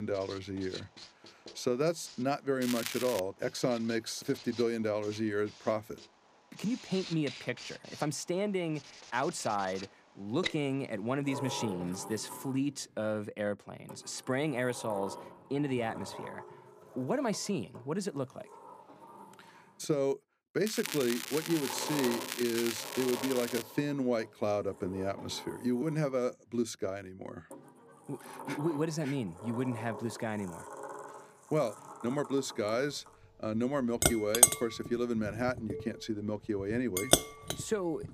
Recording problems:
household noises; loud; throughout; 2 dB below the speech
crackling; loud; at 2.5 s and from 21 to 24 s; 4 dB below the speech
abrupt cut into speech; at the start

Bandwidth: 15 kHz